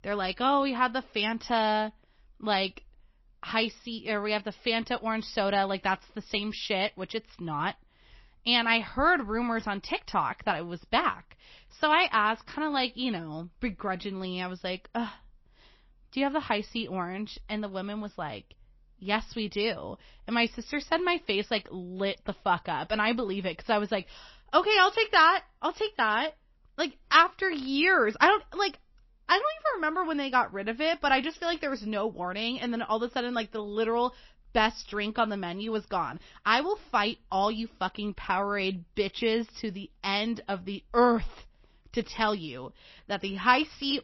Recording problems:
garbled, watery; slightly; nothing above 5.5 kHz

